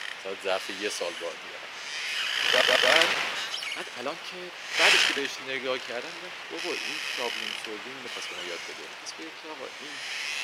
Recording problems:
thin; somewhat; fading below 350 Hz
wind noise on the microphone; heavy; 6 dB above the speech
uneven, jittery; strongly; from 2.5 to 9.5 s
audio stuttering; at 2.5 s

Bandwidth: 16 kHz